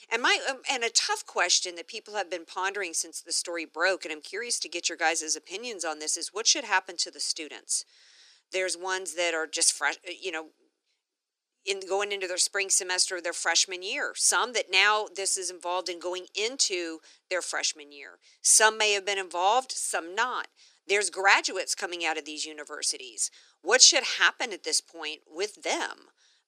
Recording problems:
thin; very; fading below 300 Hz

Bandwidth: 14 kHz